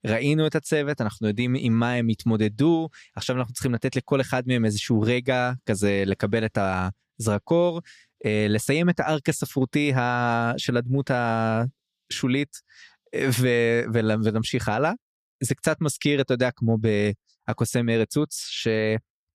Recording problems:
none

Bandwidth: 14.5 kHz